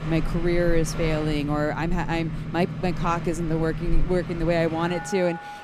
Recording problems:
train or aircraft noise; loud; throughout; 6 dB below the speech

